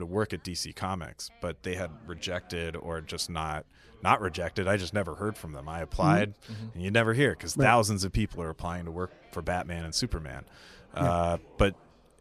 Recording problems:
background chatter; faint; throughout; 3 voices, 30 dB below the speech
abrupt cut into speech; at the start

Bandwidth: 14.5 kHz